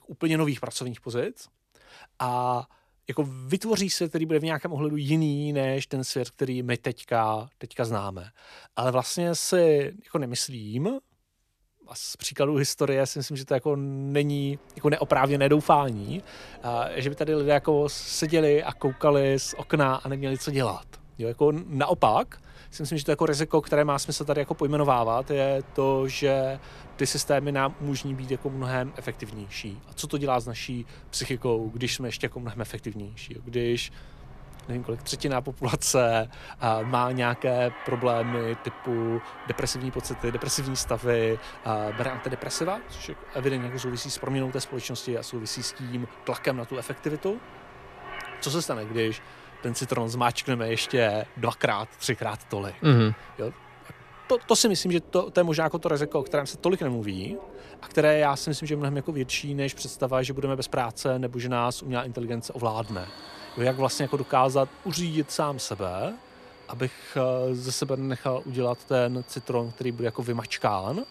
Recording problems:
train or aircraft noise; noticeable; from 15 s on; 20 dB below the speech

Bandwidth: 14.5 kHz